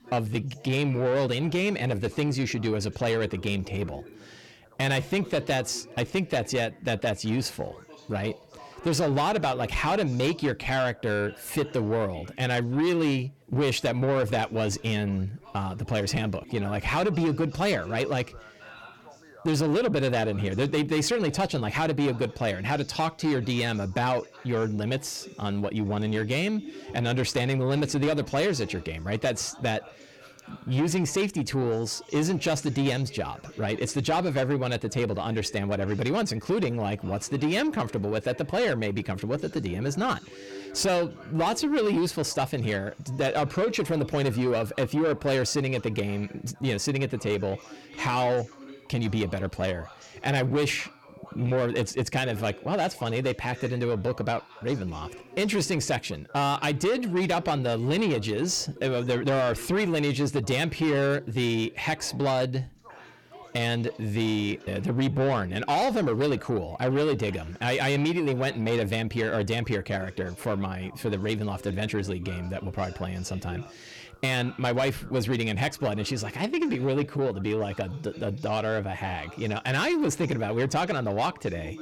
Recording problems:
distortion; slight; 10 dB below the speech
background chatter; faint; throughout; 3 voices, 20 dB below the speech

